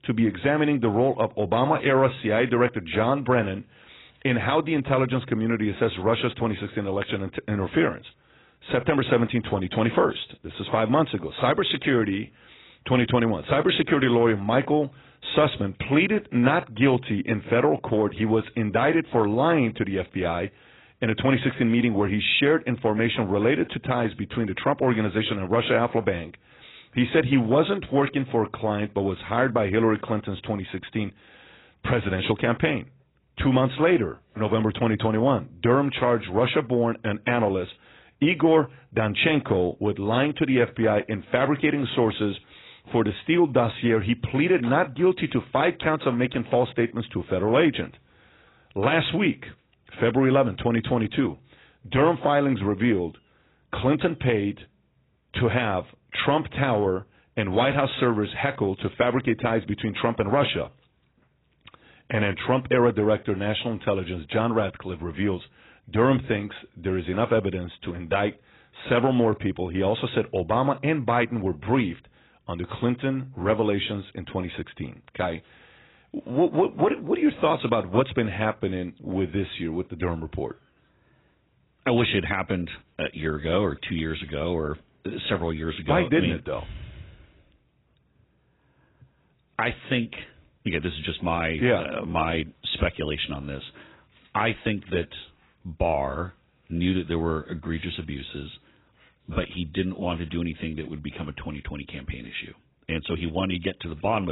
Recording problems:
garbled, watery; badly; nothing above 4 kHz
abrupt cut into speech; at the end

